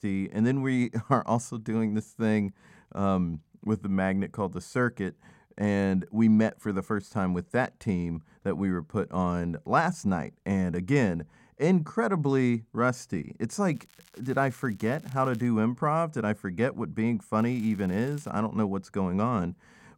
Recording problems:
crackling; faint; from 14 to 15 s and at 17 s; 30 dB below the speech

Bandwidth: 16.5 kHz